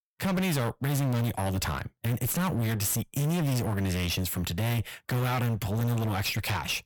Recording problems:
distortion; heavy; 36% of the sound clipped

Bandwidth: 18.5 kHz